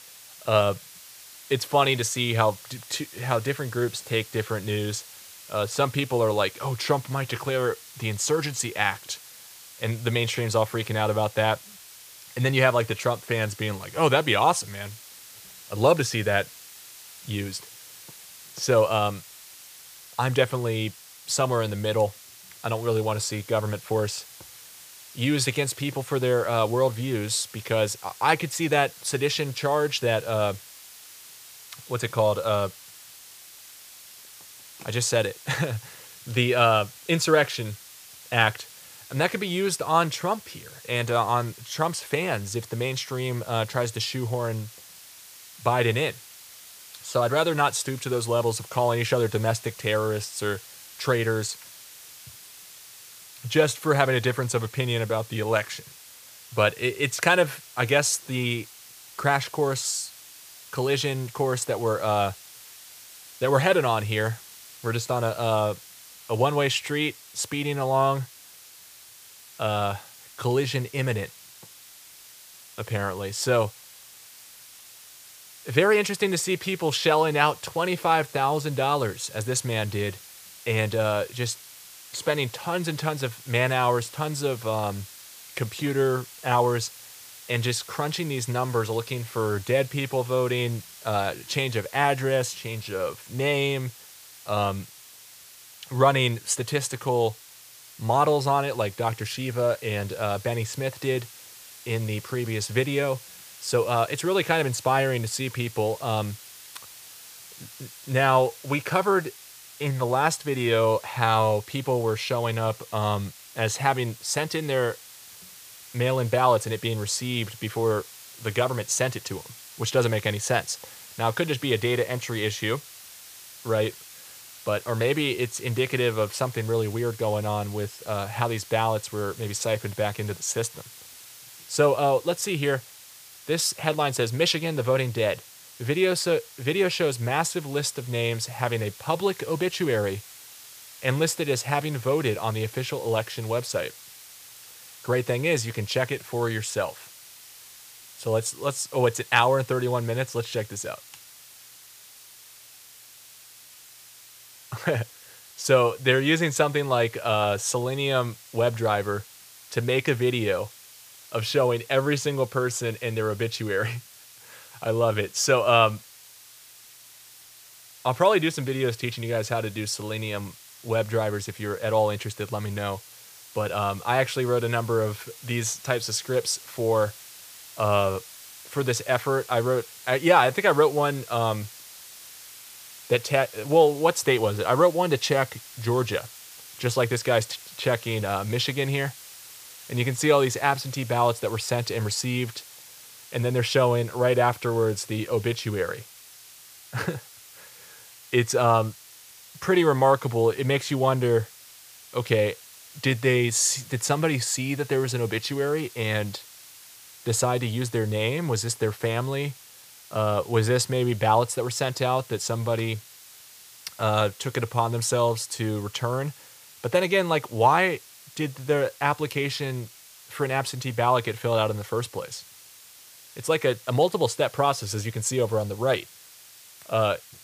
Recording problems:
hiss; noticeable; throughout; 20 dB below the speech

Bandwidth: 15 kHz